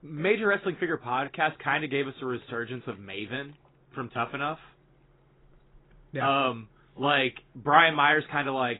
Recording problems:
garbled, watery; badly; nothing above 3.5 kHz

